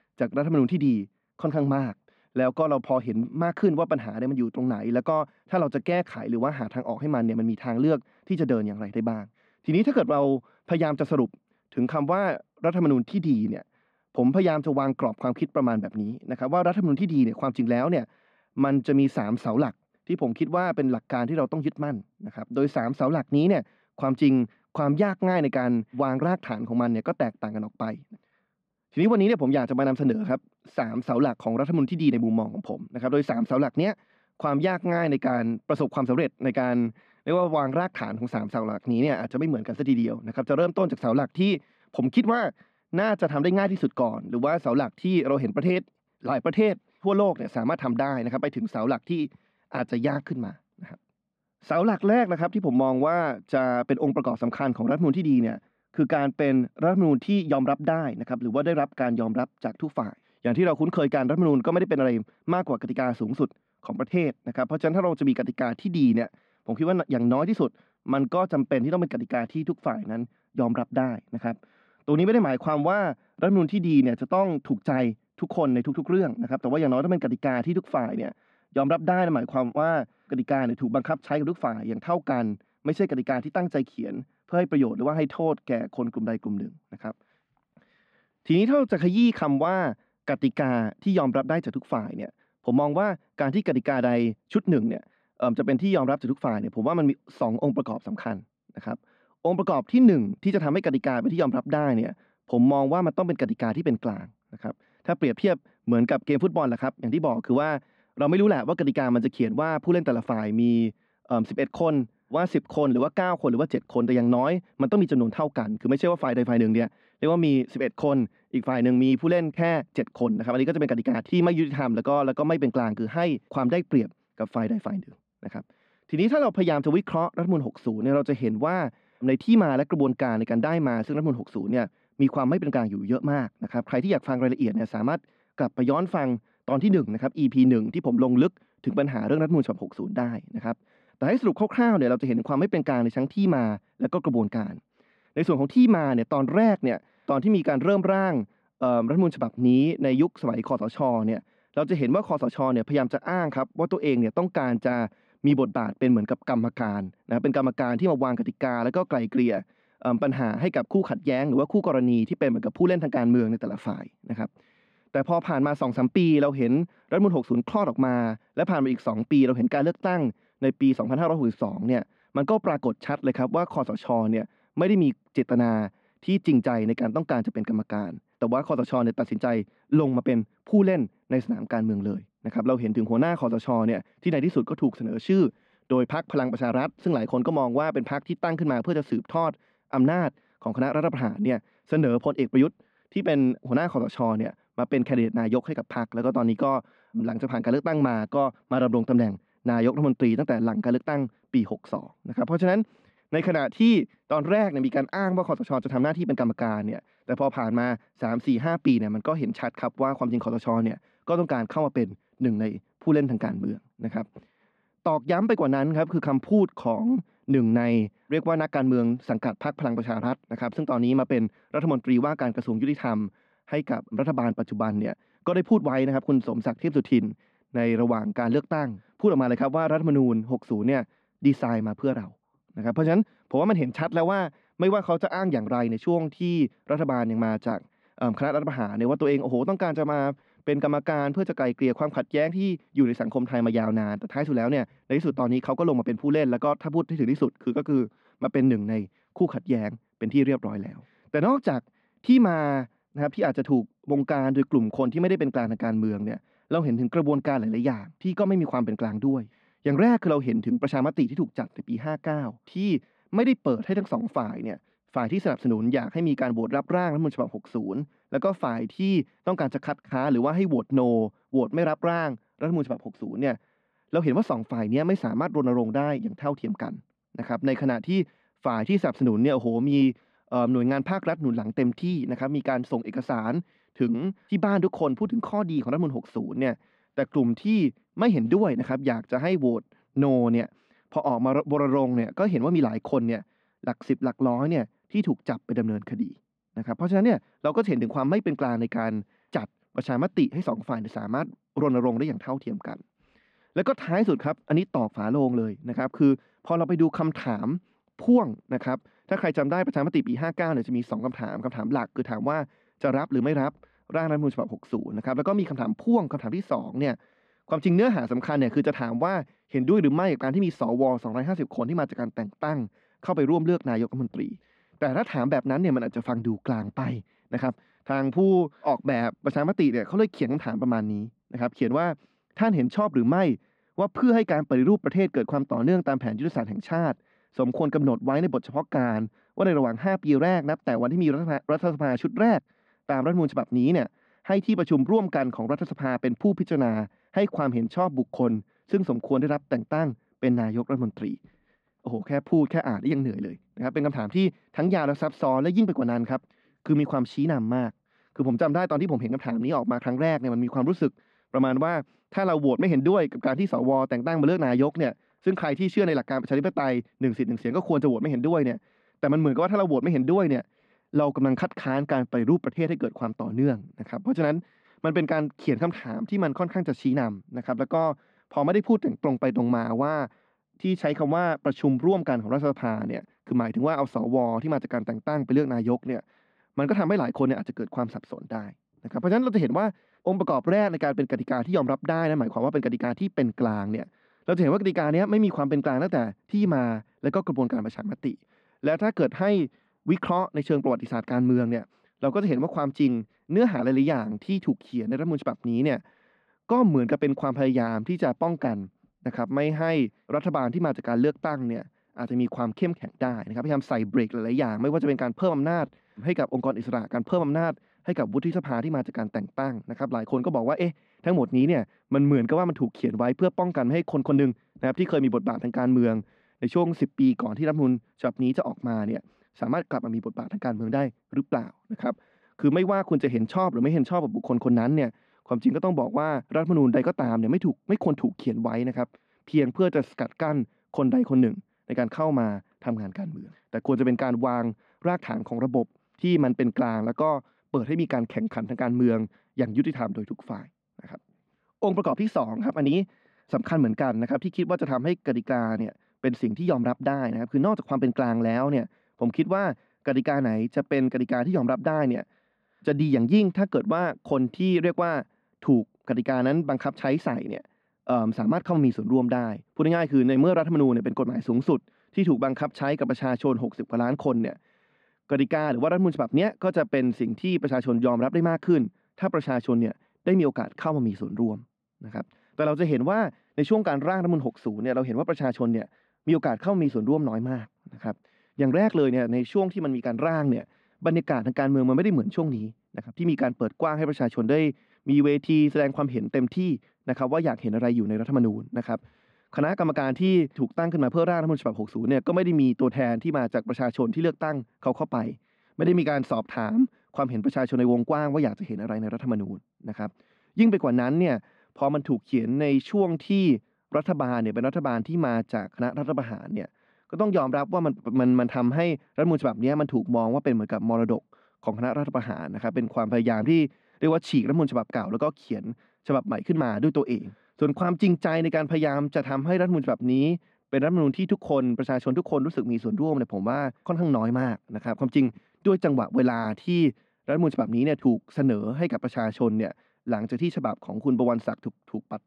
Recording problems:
muffled; slightly; fading above 2.5 kHz

